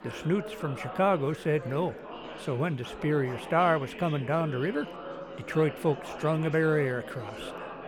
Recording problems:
chatter from many people; noticeable; throughout; 10 dB below the speech

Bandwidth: 18.5 kHz